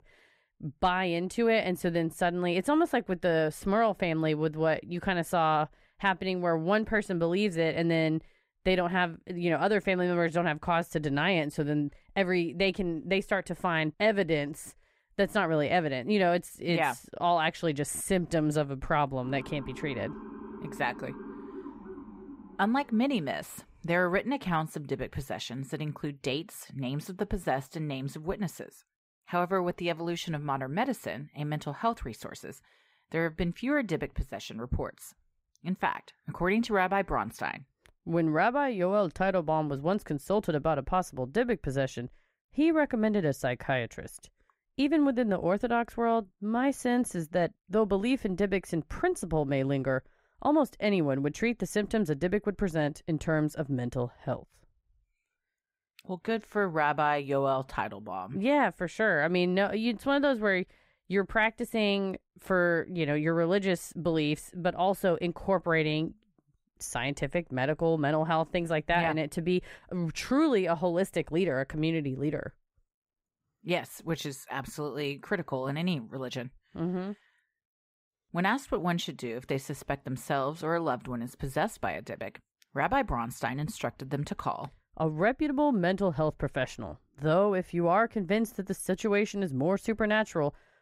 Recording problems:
muffled; slightly; fading above 3 kHz
siren; faint; from 19 to 23 s; peak 15 dB below the speech

